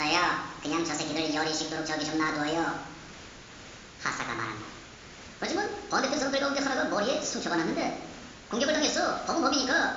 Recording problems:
wrong speed and pitch; too fast and too high; 1.5 times normal speed
high frequencies cut off; noticeable; nothing above 7.5 kHz
room echo; slight; dies away in 0.8 s
off-mic speech; somewhat distant
hiss; noticeable; throughout; 15 dB below the speech
abrupt cut into speech; at the start

